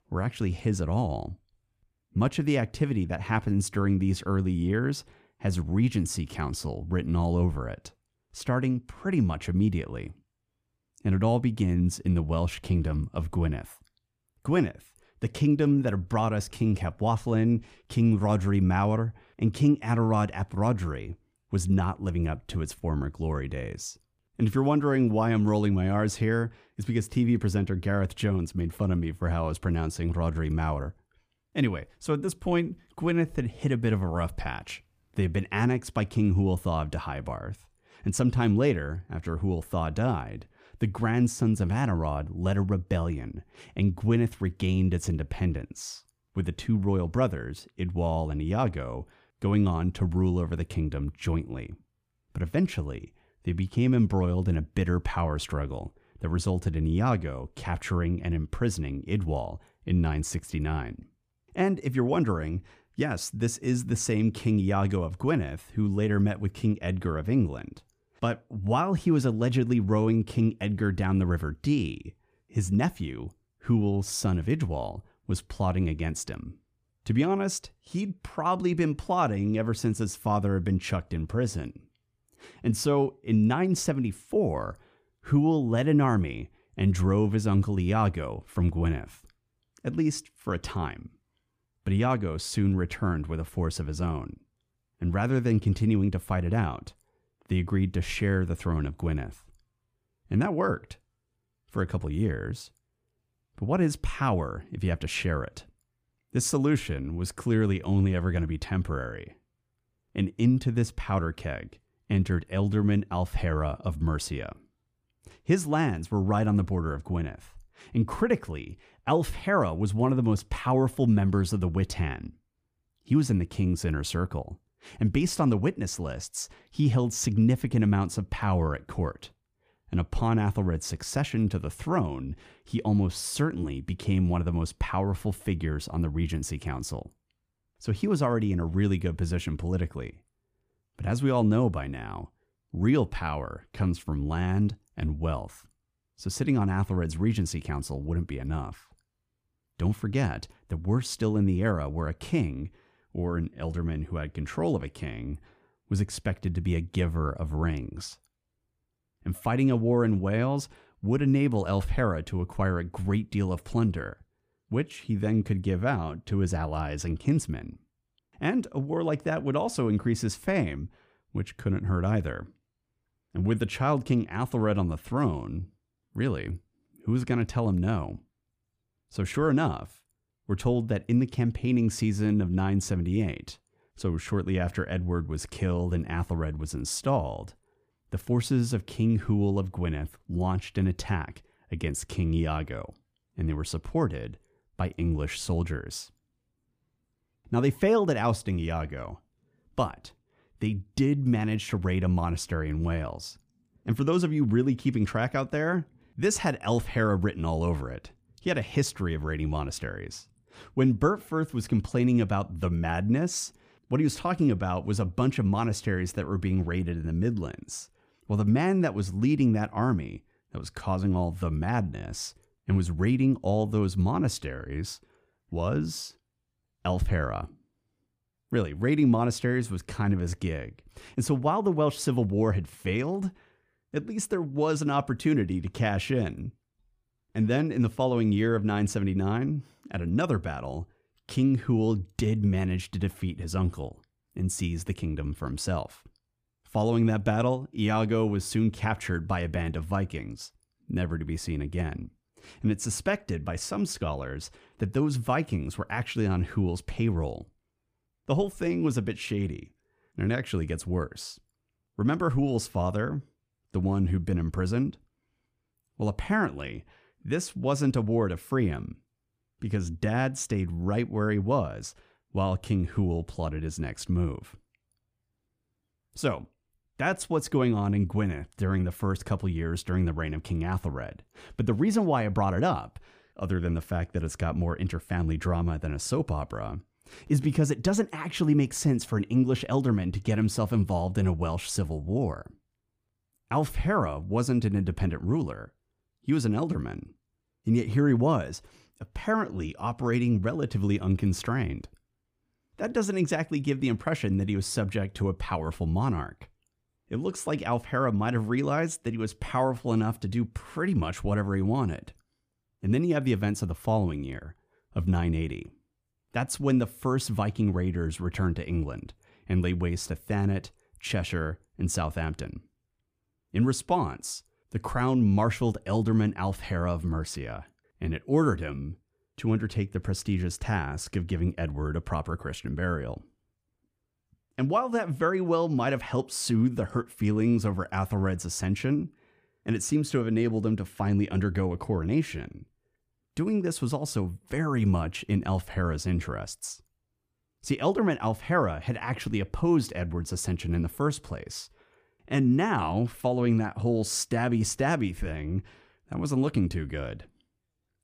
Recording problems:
none

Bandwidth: 15 kHz